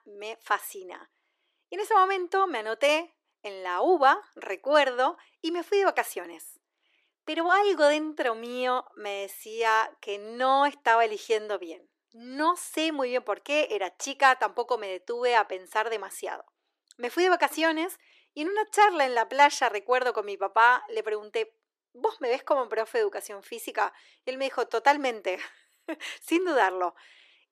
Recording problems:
thin; very; fading below 350 Hz

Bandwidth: 14.5 kHz